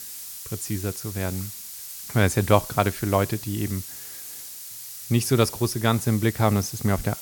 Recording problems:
hiss; noticeable; throughout; 10 dB below the speech

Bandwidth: 17.5 kHz